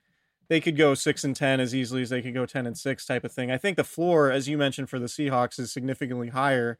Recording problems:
none

